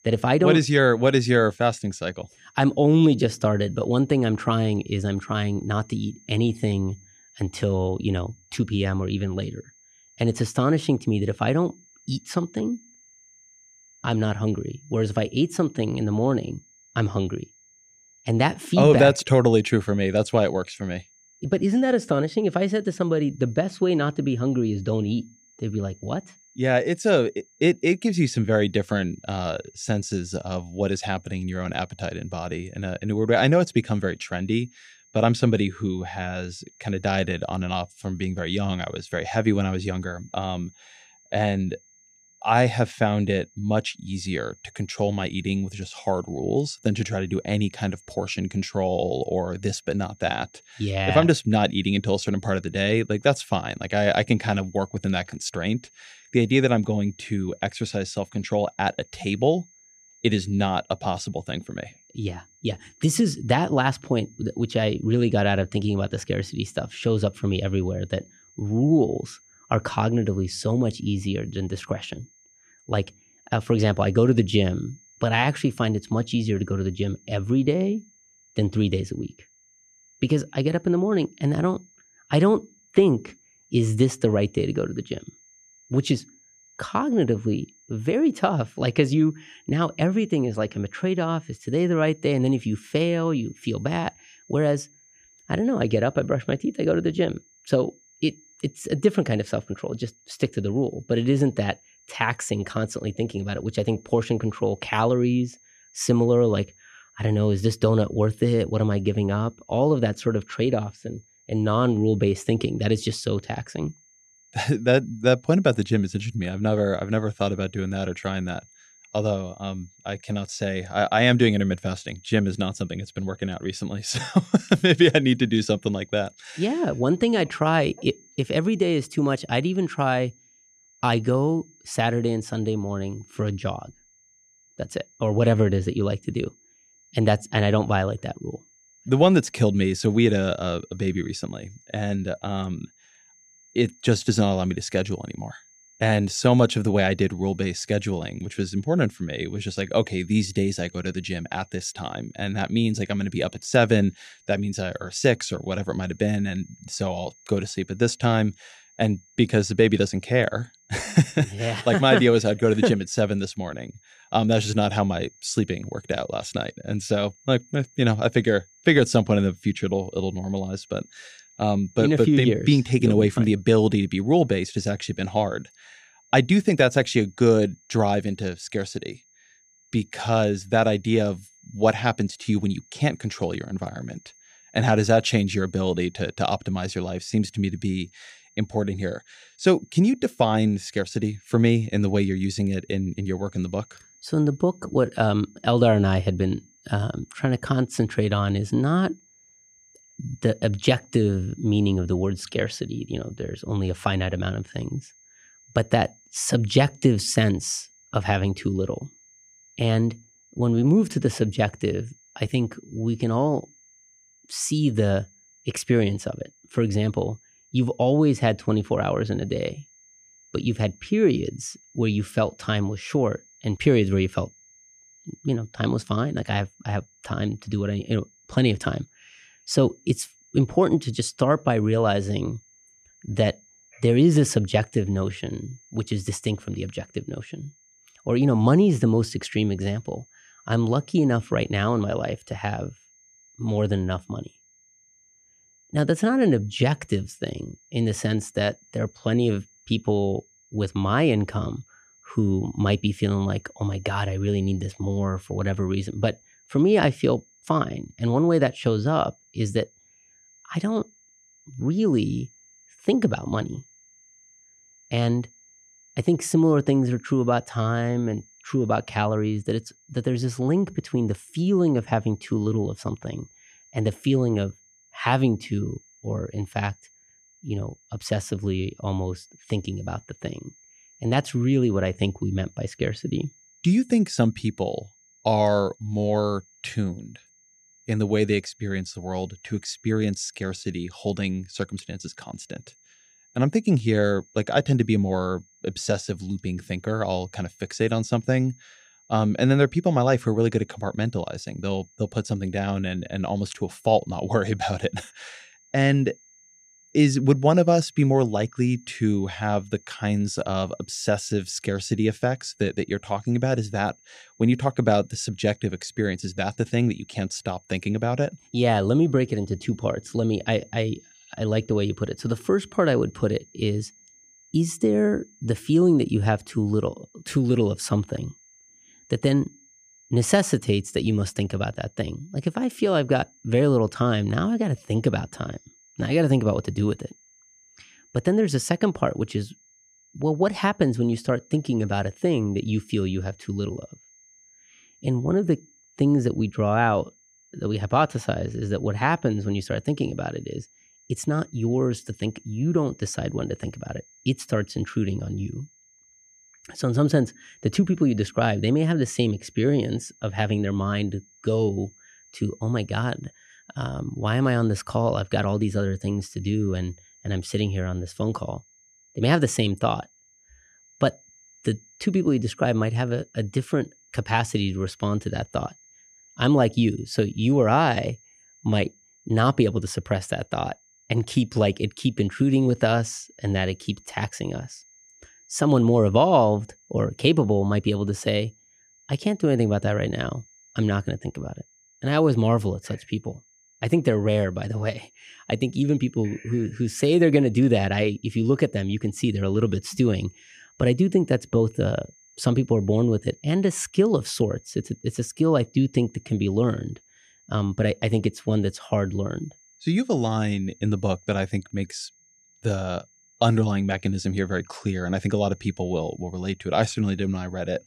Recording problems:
high-pitched whine; faint; throughout; 6.5 kHz, 30 dB below the speech

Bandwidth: 15 kHz